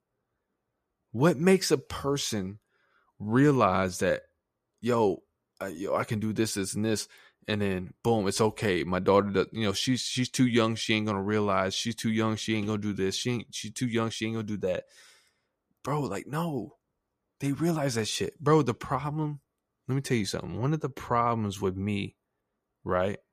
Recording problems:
none

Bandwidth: 14.5 kHz